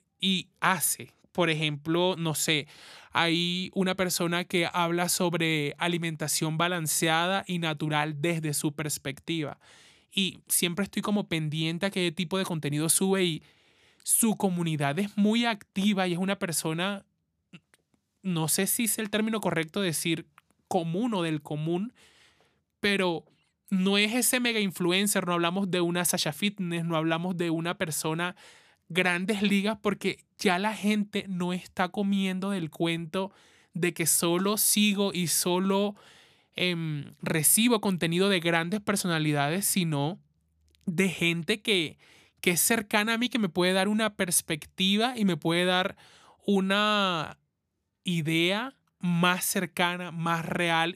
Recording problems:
none

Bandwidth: 14.5 kHz